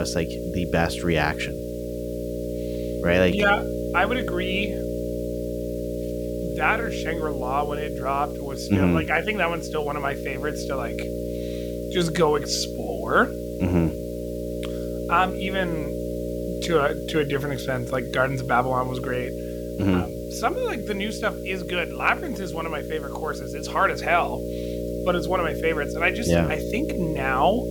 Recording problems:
electrical hum; loud; throughout; 60 Hz, 8 dB below the speech
hiss; faint; throughout; 25 dB below the speech
abrupt cut into speech; at the start

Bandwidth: 18 kHz